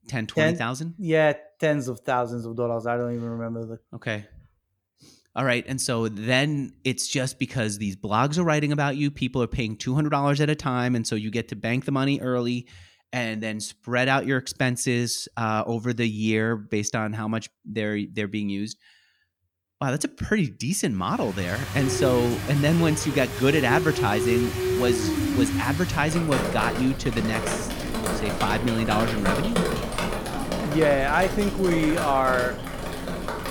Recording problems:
rain or running water; loud; from 21 s on; 3 dB below the speech

